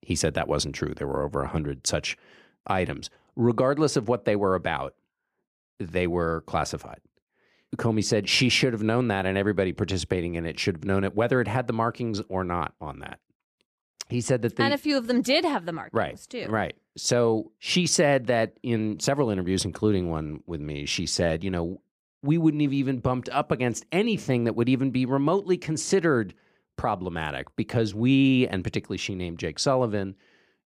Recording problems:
none

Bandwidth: 15 kHz